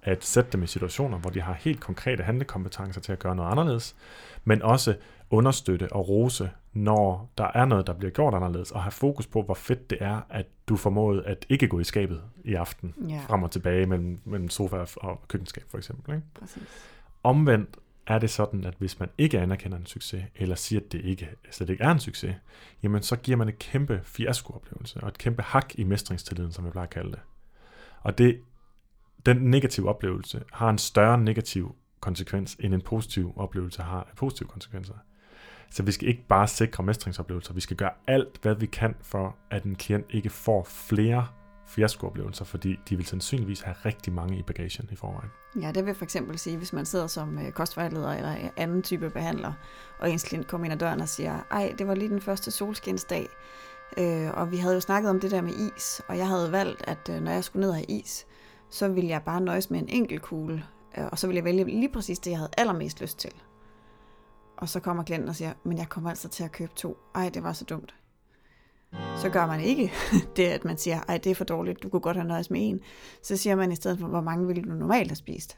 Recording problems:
background music; faint; throughout; 20 dB below the speech

